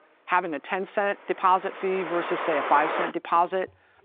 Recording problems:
phone-call audio
traffic noise; loud; throughout; 5 dB below the speech

